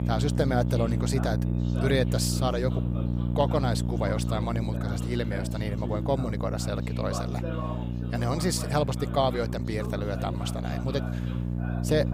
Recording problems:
electrical hum; loud; throughout; 60 Hz, 9 dB below the speech
background chatter; noticeable; throughout; 2 voices, 10 dB below the speech

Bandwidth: 15.5 kHz